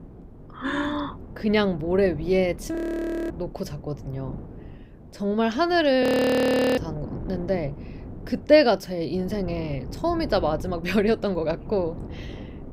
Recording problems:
wind noise on the microphone; occasional gusts; 20 dB below the speech
audio freezing; at 3 s for 0.5 s and at 6 s for 0.5 s

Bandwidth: 15.5 kHz